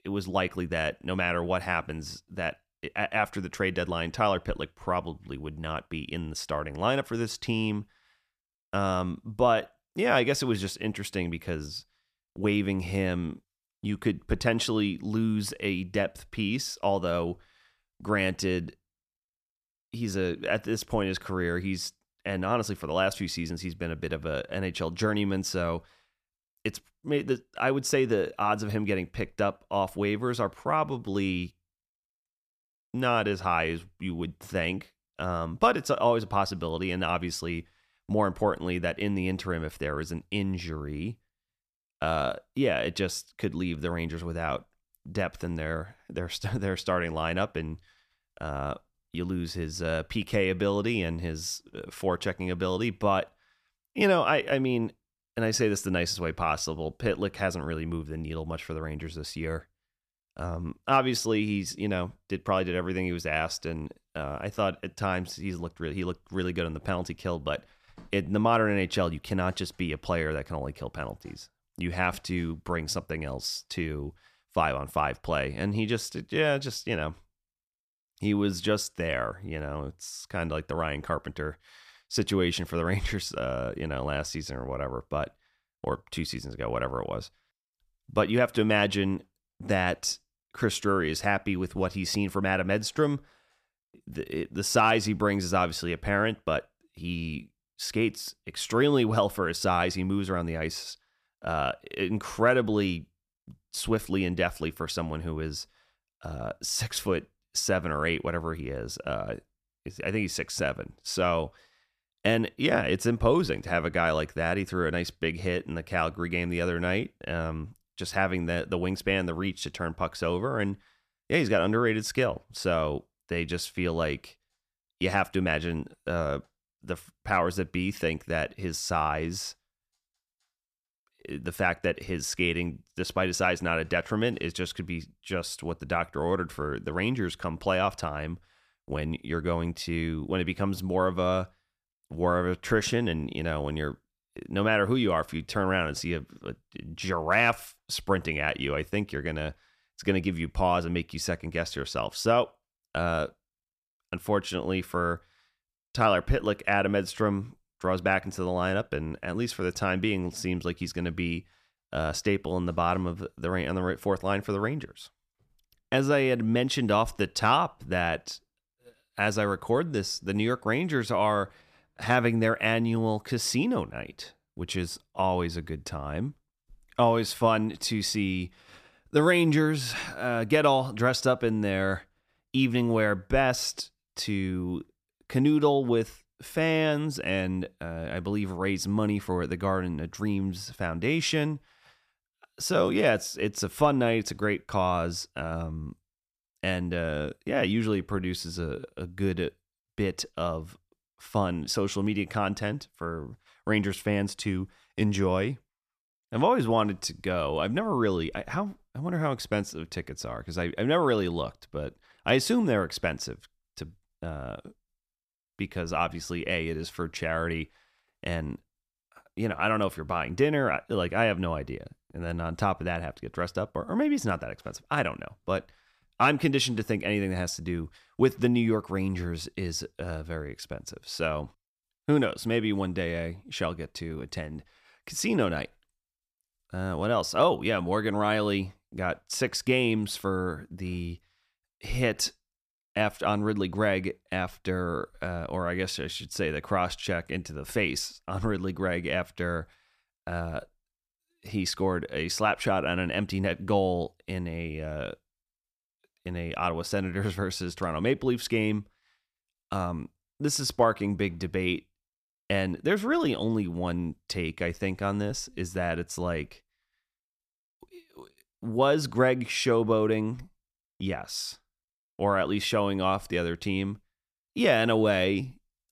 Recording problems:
none

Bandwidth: 14.5 kHz